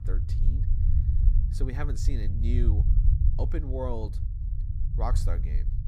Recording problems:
low rumble; loud; throughout; 7 dB below the speech

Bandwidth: 15 kHz